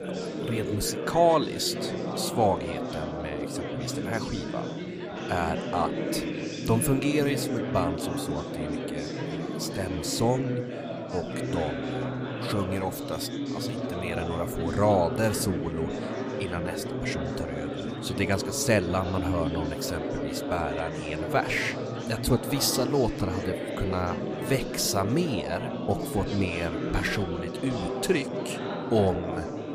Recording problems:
chatter from many people; loud; throughout; 3 dB below the speech

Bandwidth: 15 kHz